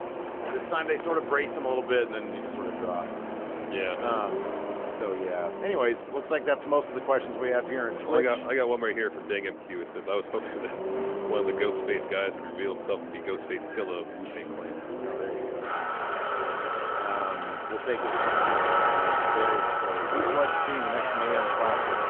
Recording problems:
phone-call audio; nothing above 3.5 kHz
traffic noise; loud; throughout; as loud as the speech

